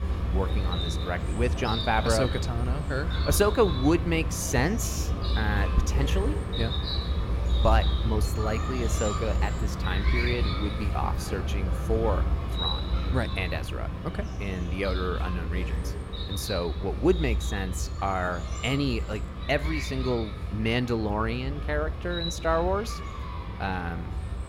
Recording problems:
animal sounds; loud; throughout; as loud as the speech

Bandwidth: 16 kHz